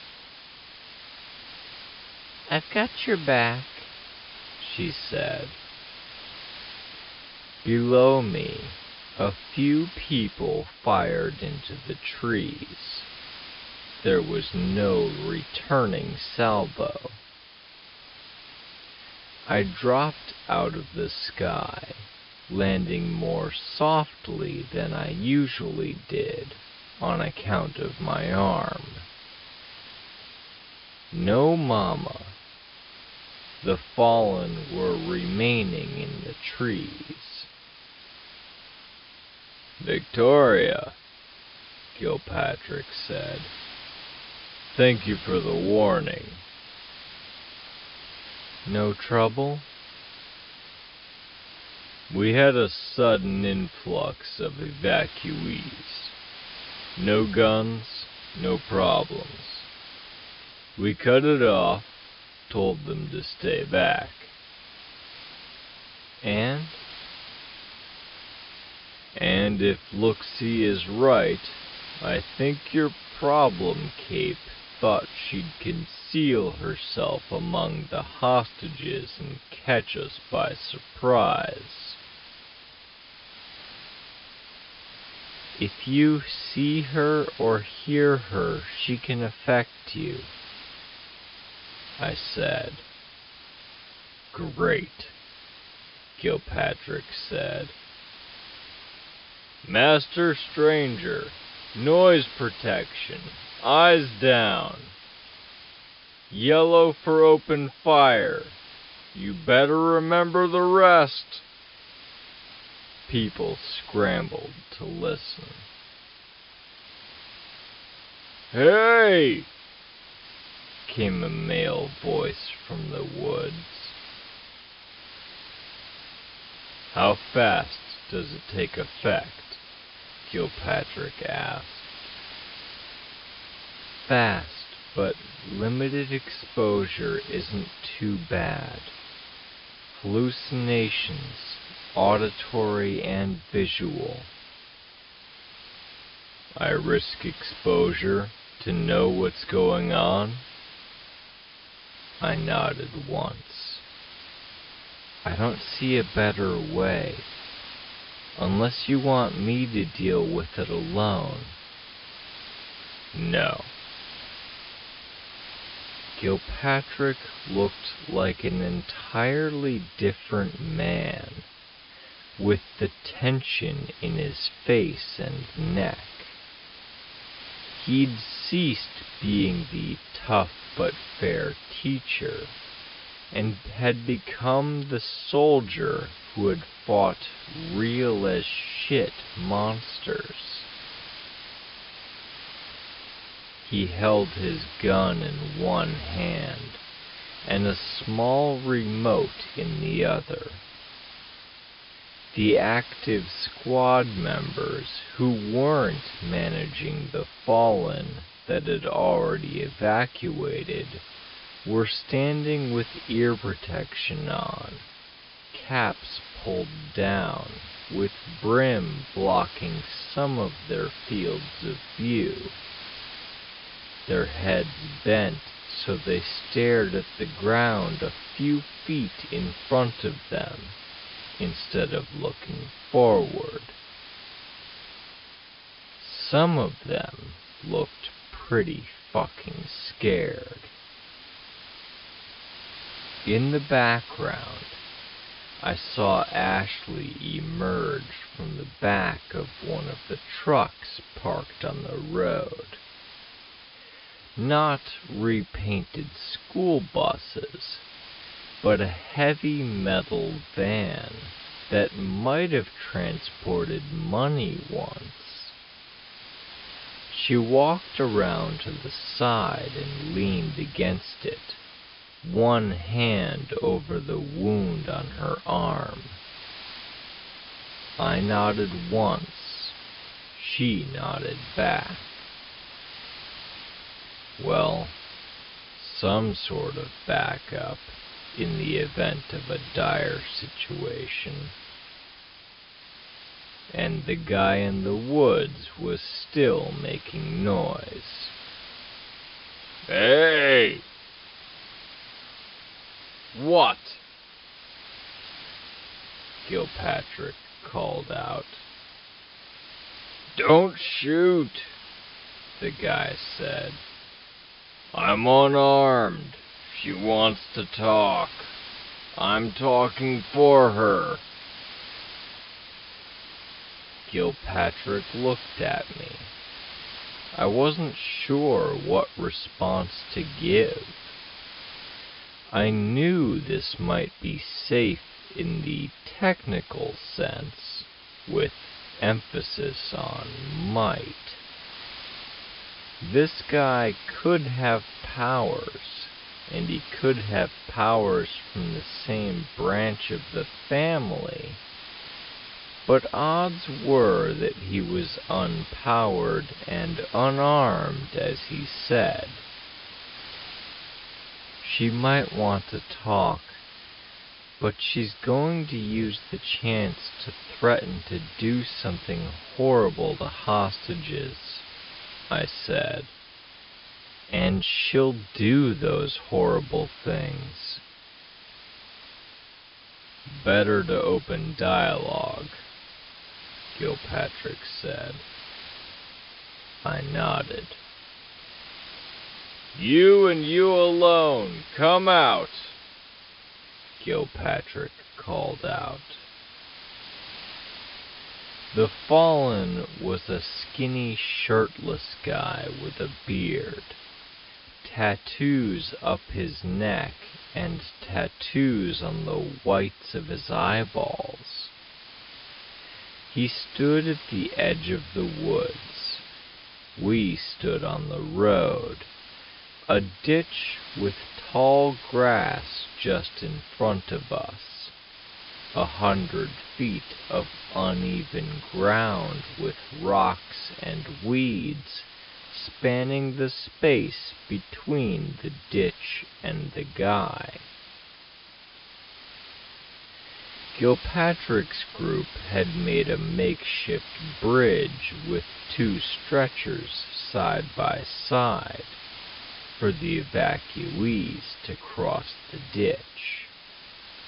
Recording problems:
wrong speed, natural pitch; too slow; 0.5 times normal speed
high frequencies cut off; noticeable; nothing above 5 kHz
hiss; noticeable; throughout; 15 dB below the speech

